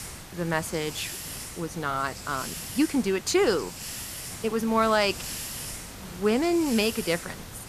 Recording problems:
hiss; loud; throughout; 10 dB below the speech

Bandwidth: 14.5 kHz